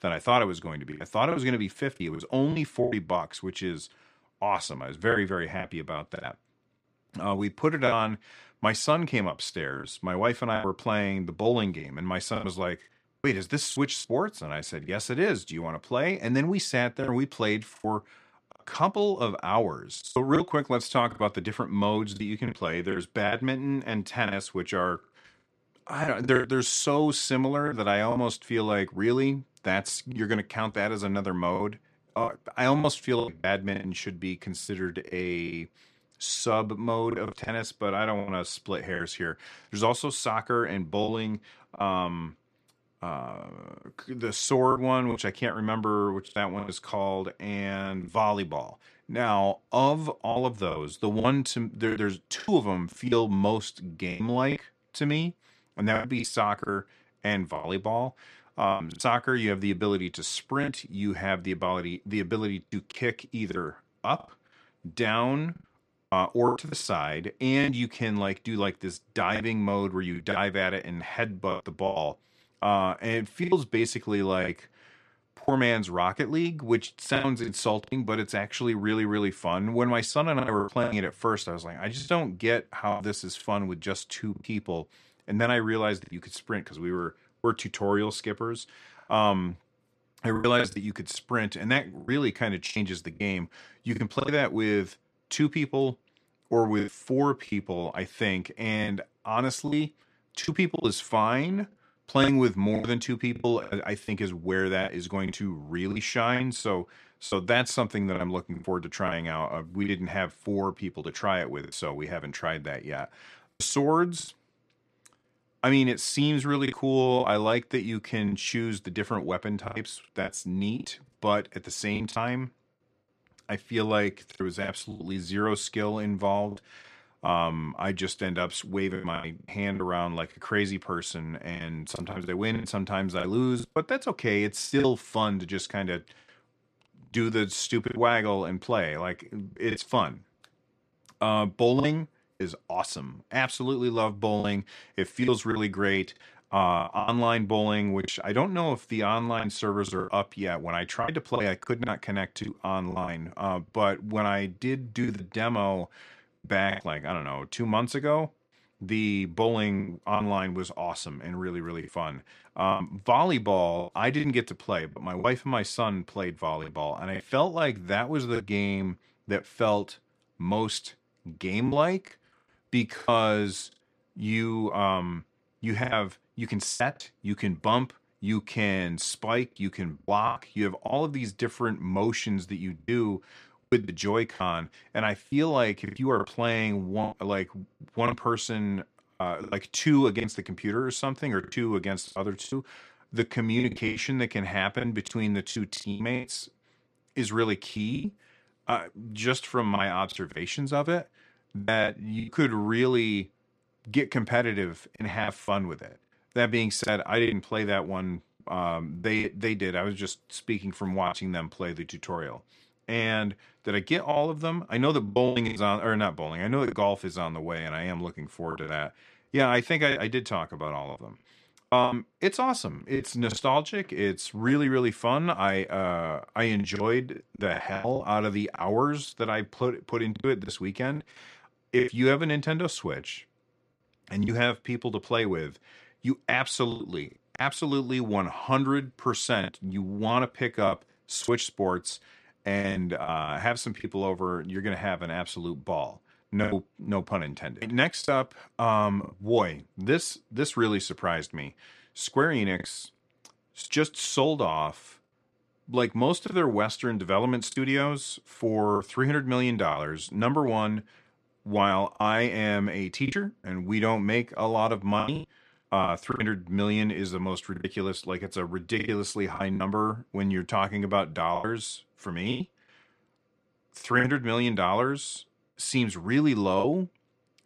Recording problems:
choppy; very; 7% of the speech affected

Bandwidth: 14.5 kHz